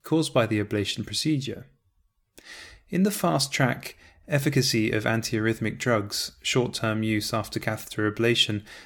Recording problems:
none

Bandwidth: 18.5 kHz